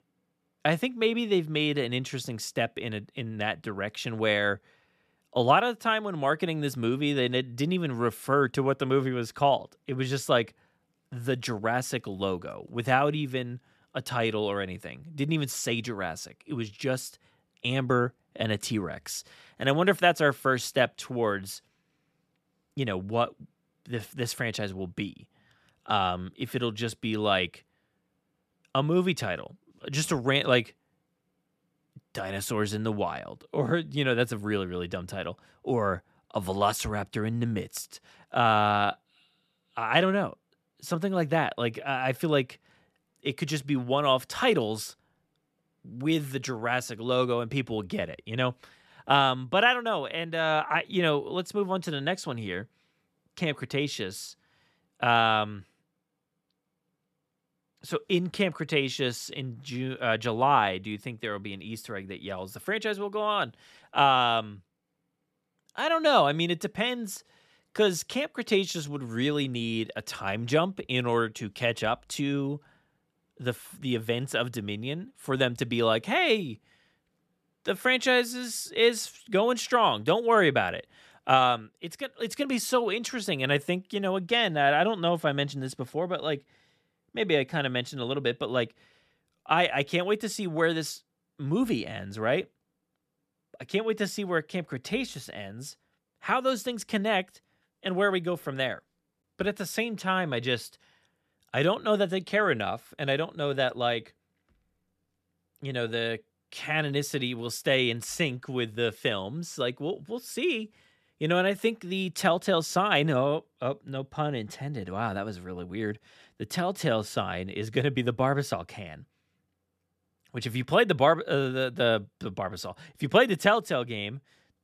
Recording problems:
none

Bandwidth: 14 kHz